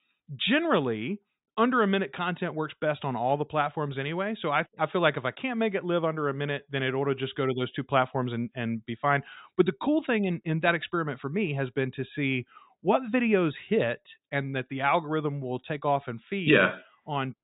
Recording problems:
high frequencies cut off; severe; nothing above 4 kHz

